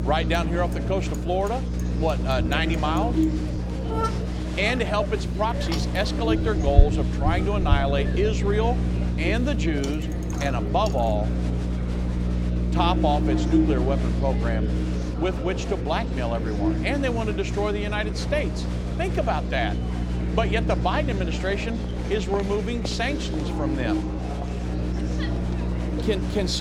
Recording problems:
electrical hum; loud; throughout; 60 Hz, 9 dB below the speech
traffic noise; loud; throughout; 8 dB below the speech
murmuring crowd; loud; throughout; 7 dB below the speech
abrupt cut into speech; at the end

